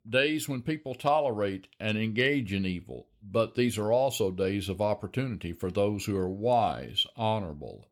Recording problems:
none

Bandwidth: 18 kHz